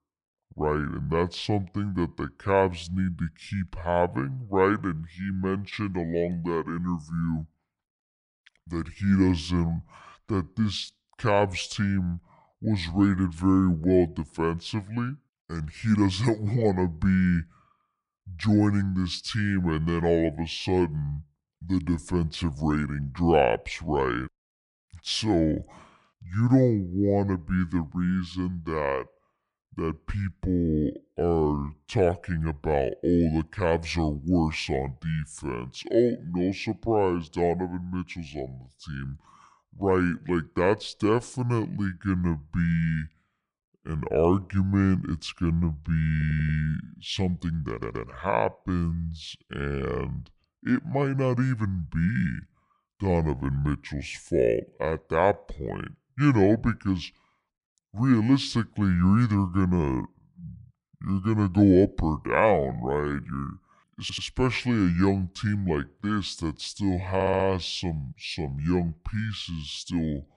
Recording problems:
wrong speed and pitch; too slow and too low; 0.6 times normal speed
audio stuttering; 4 times, first at 46 s

